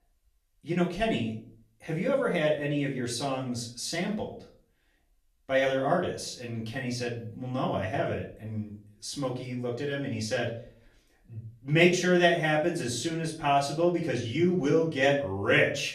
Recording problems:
off-mic speech; far
room echo; slight; dies away in 0.4 s

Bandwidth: 14.5 kHz